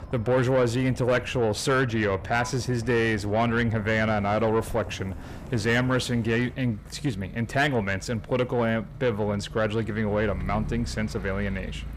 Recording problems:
distortion; slight; 10 dB below the speech
traffic noise; noticeable; throughout; 15 dB below the speech

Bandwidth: 15 kHz